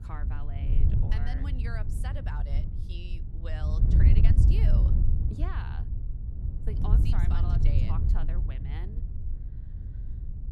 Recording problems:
wind noise on the microphone; heavy; 1 dB above the speech

